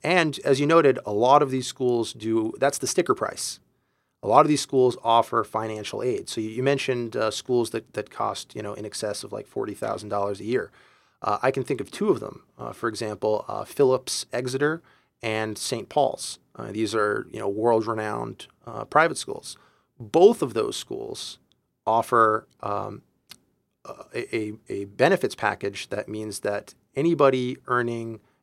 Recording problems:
none

